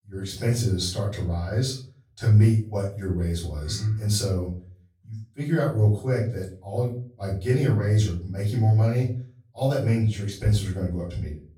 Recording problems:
off-mic speech; far
room echo; slight; dies away in 0.4 s

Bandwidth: 17.5 kHz